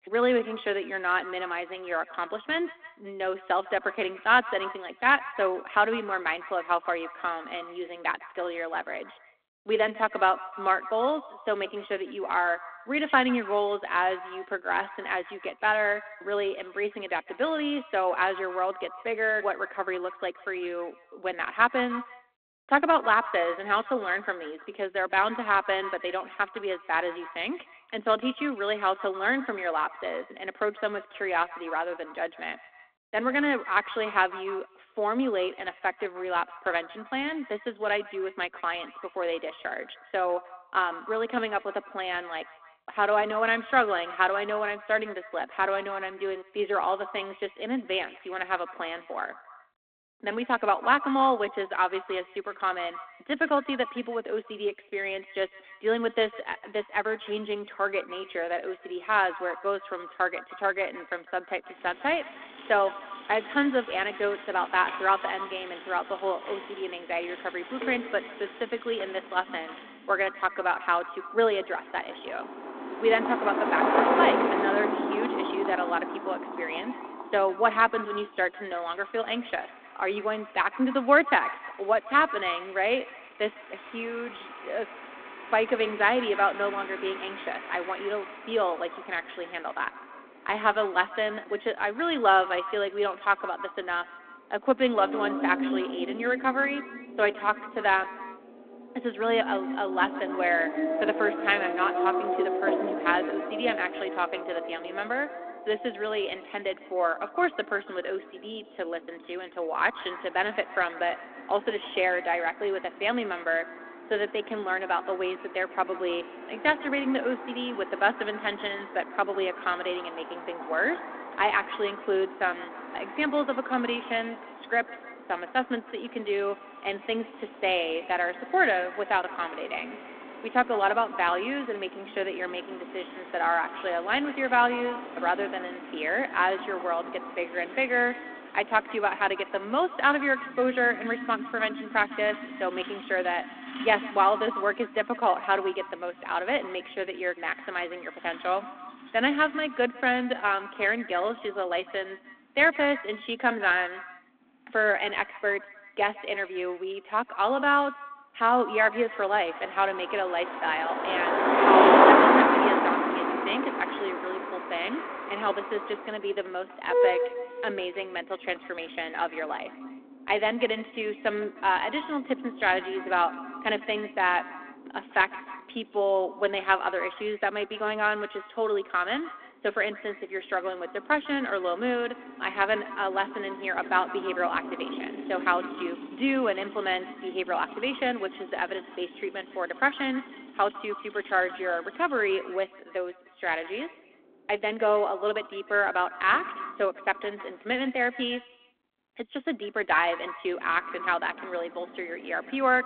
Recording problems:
echo of what is said; noticeable; throughout; 150 ms later, 15 dB below the speech
phone-call audio
traffic noise; loud; from 1:02 on; 2 dB below the speech

